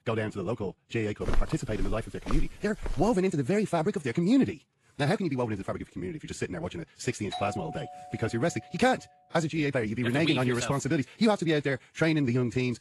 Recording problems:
wrong speed, natural pitch; too fast; 1.6 times normal speed
garbled, watery; slightly; nothing above 11.5 kHz
footsteps; noticeable; from 1.5 to 3 s; peak 6 dB below the speech
doorbell; noticeable; from 7.5 to 9 s; peak 9 dB below the speech

